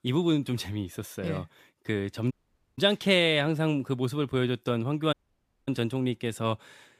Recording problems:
audio cutting out; at 2.5 s and at 5 s for 0.5 s

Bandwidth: 15 kHz